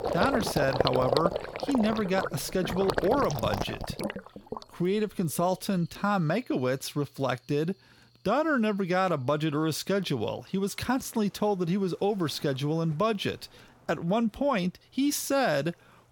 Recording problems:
rain or running water; loud; throughout; 4 dB below the speech

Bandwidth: 17 kHz